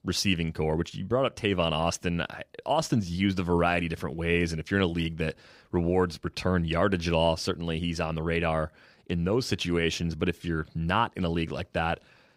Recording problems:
none

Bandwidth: 15.5 kHz